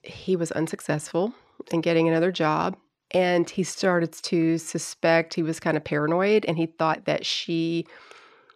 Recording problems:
uneven, jittery; strongly; from 1 to 7.5 s

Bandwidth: 13.5 kHz